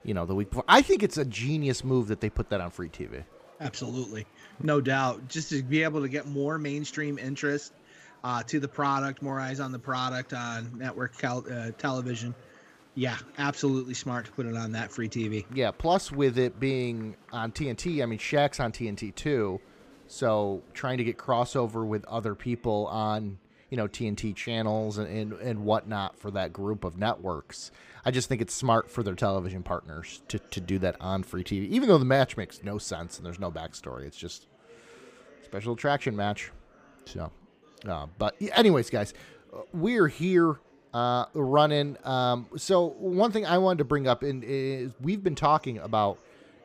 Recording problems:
murmuring crowd; faint; throughout; 25 dB below the speech

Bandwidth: 15 kHz